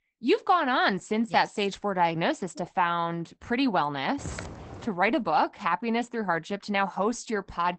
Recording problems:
garbled, watery; badly; nothing above 8 kHz
footsteps; faint; at 4 s; peak 10 dB below the speech

